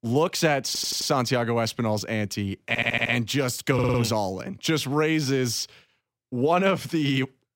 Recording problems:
audio stuttering; at 0.5 s, at 2.5 s and at 3.5 s

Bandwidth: 16 kHz